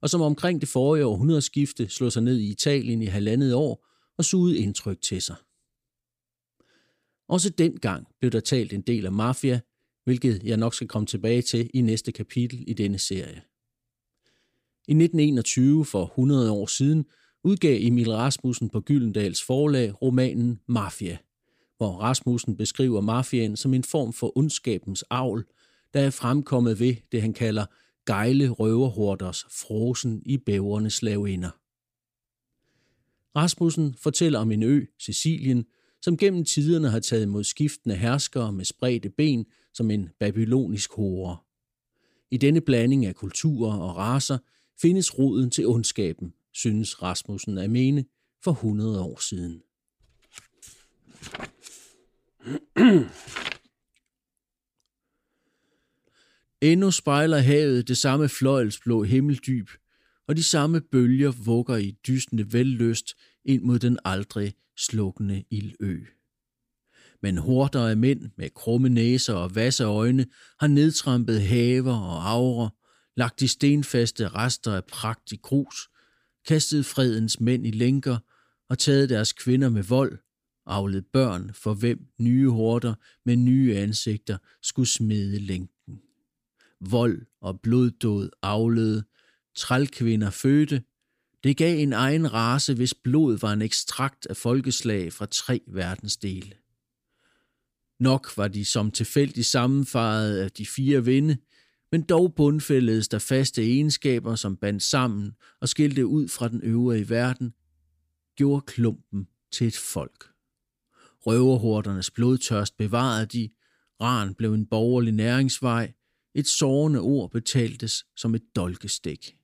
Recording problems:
none

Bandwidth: 15 kHz